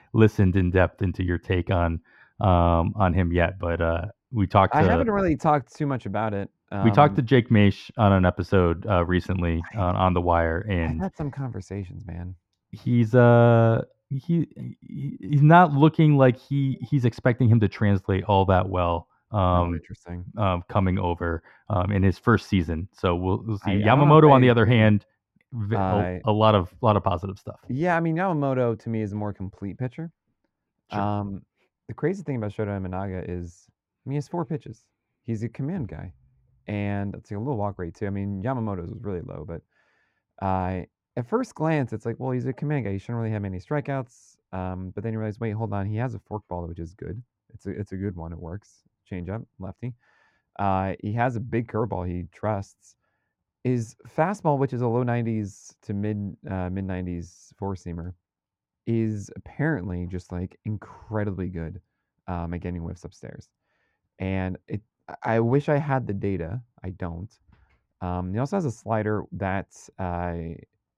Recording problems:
muffled; very; fading above 4 kHz

